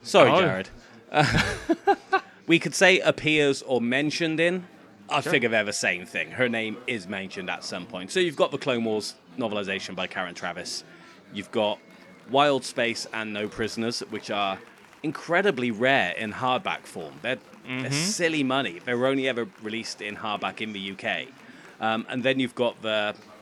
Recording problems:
chatter from many people; faint; throughout; 25 dB below the speech

